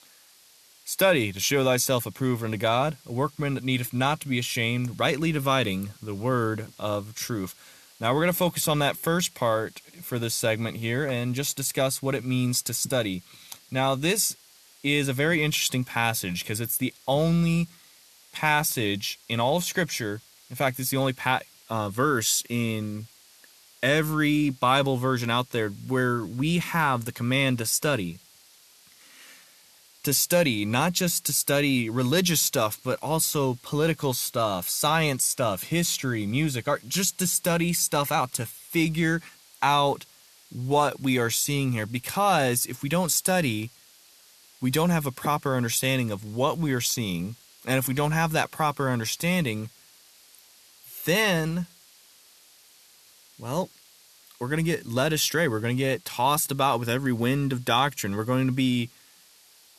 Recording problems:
hiss; faint; throughout; 25 dB below the speech

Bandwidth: 13.5 kHz